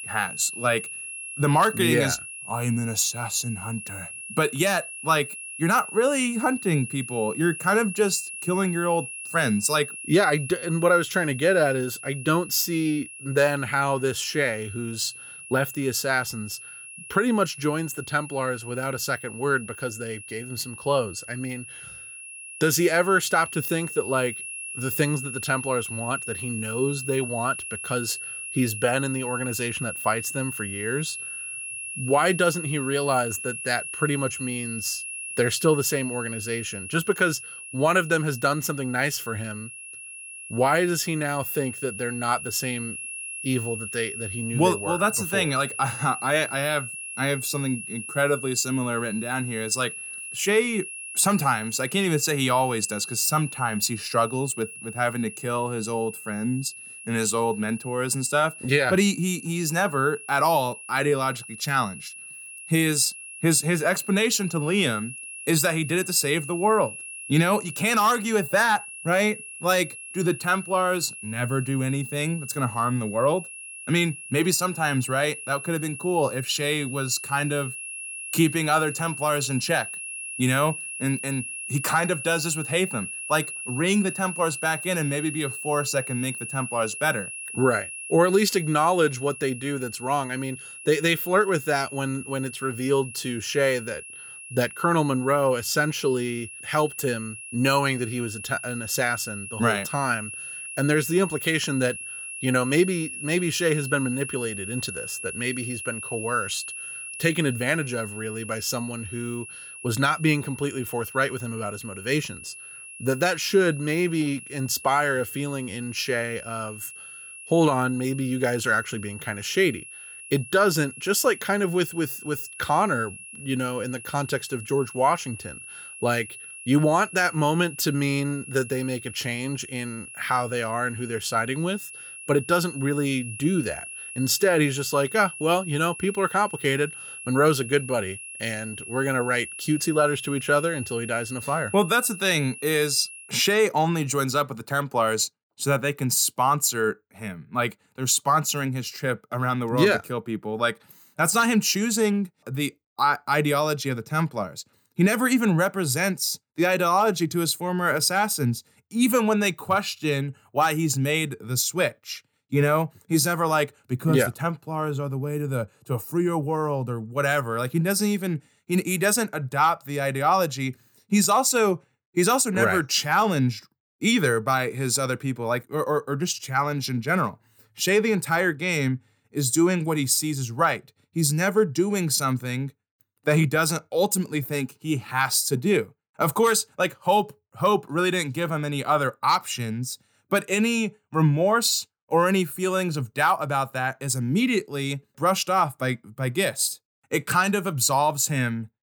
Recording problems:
high-pitched whine; noticeable; until 2:23; 2.5 kHz, 10 dB below the speech

